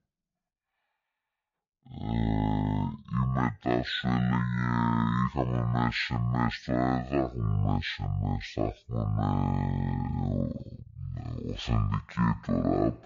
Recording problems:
wrong speed and pitch; too slow and too low; 0.5 times normal speed

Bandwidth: 7 kHz